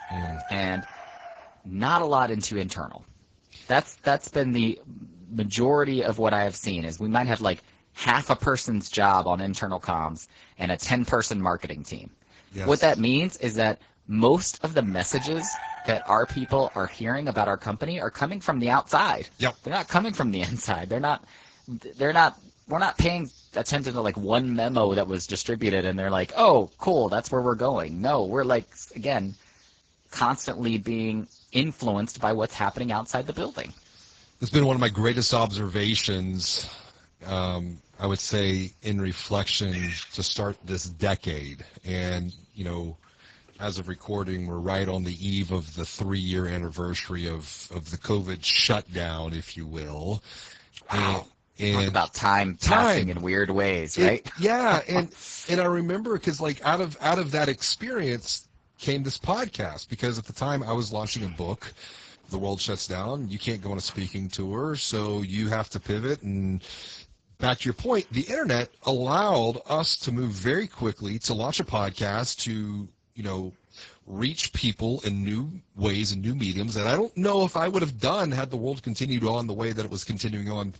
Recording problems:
garbled, watery; badly; nothing above 7.5 kHz
animal sounds; noticeable; throughout; 20 dB below the speech

